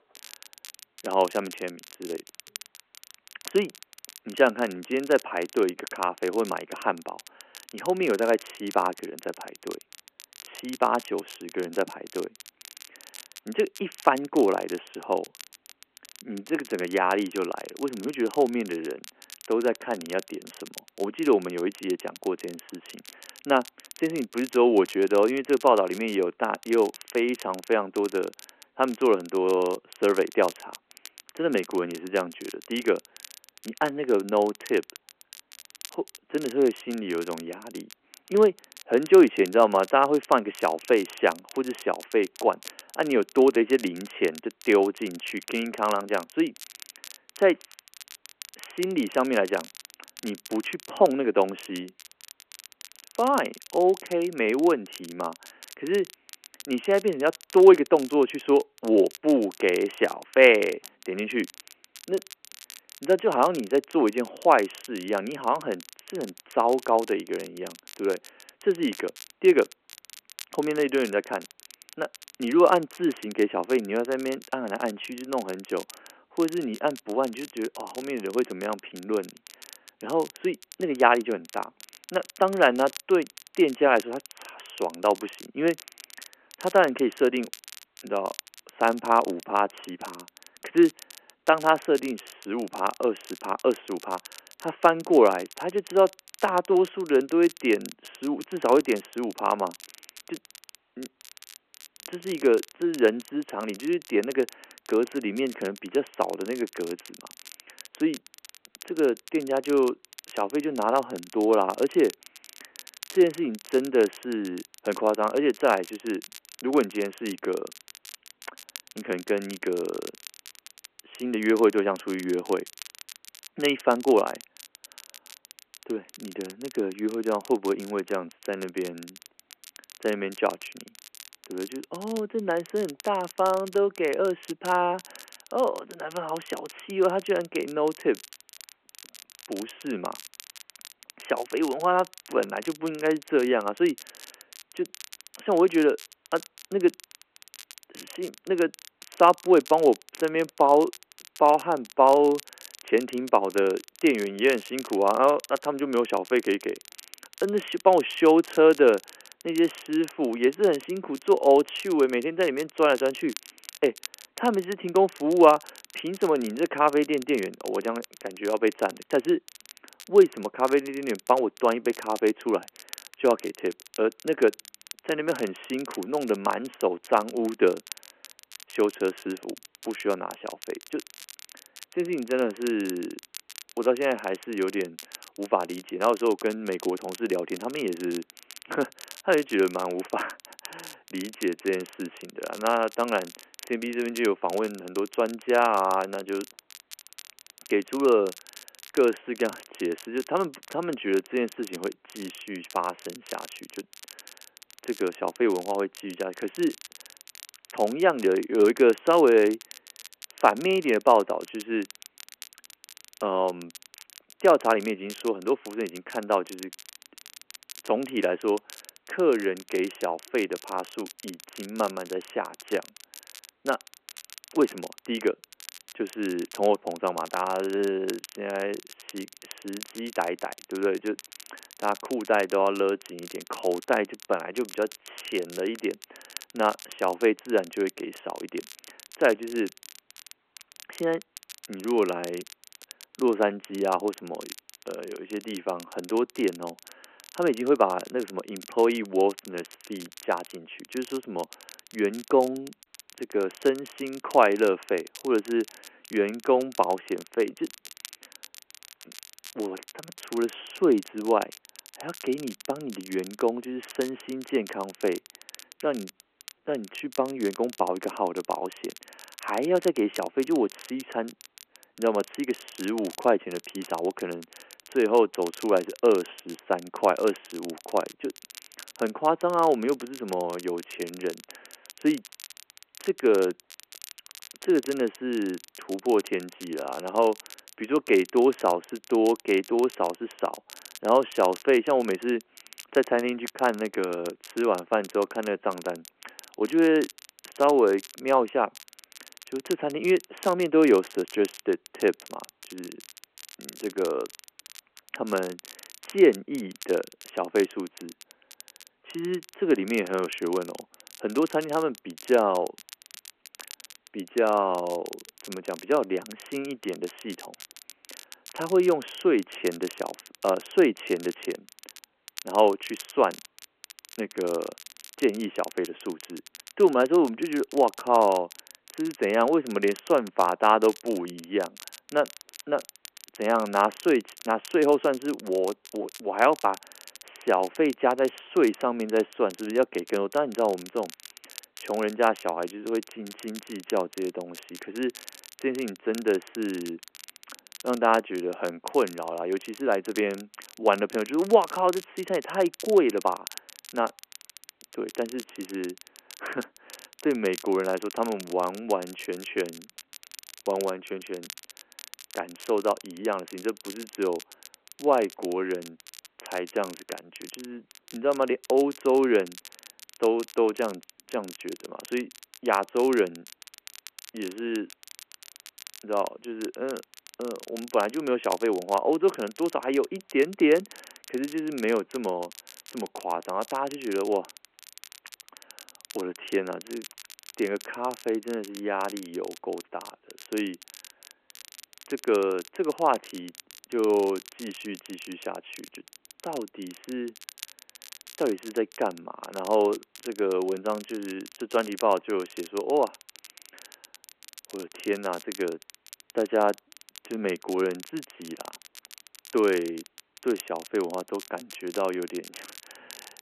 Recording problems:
phone-call audio
crackle, like an old record; noticeable; 20 dB below the speech

